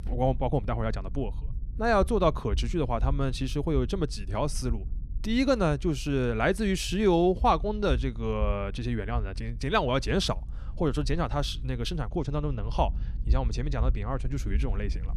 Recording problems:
low rumble; faint; throughout; 25 dB below the speech

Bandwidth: 14 kHz